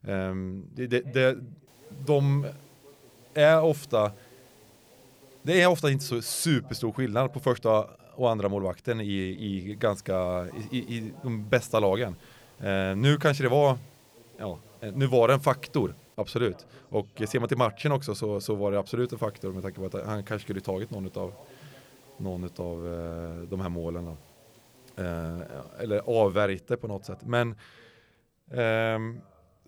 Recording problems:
voice in the background; faint; throughout; 30 dB below the speech
hiss; faint; from 1.5 to 6 s, from 9.5 to 16 s and from 19 to 26 s; 30 dB below the speech

